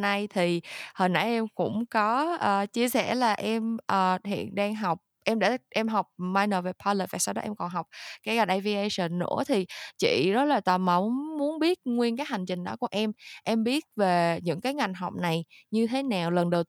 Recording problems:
abrupt cut into speech; at the start

